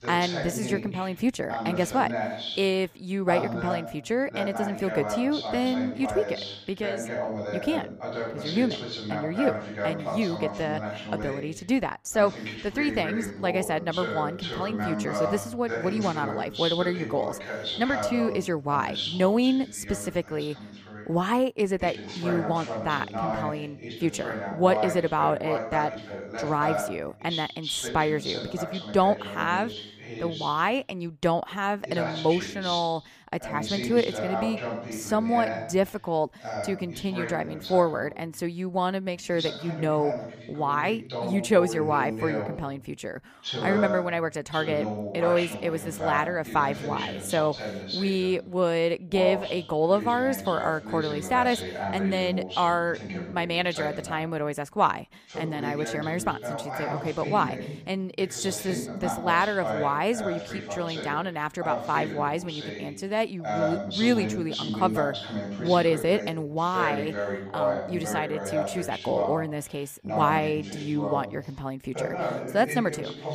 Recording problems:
voice in the background; loud; throughout; 5 dB below the speech

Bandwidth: 15 kHz